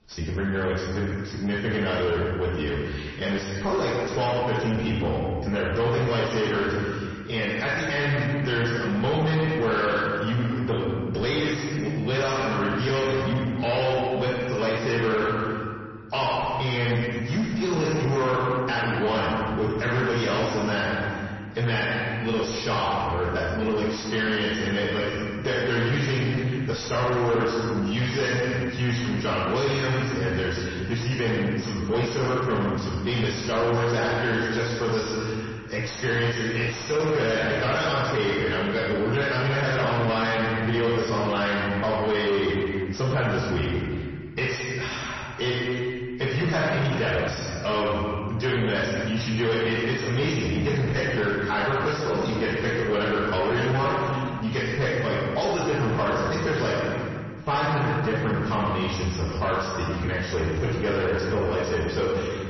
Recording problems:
distortion; heavy; 7 dB below the speech
off-mic speech; far
room echo; noticeable; dies away in 1.4 s
garbled, watery; slightly; nothing above 6 kHz

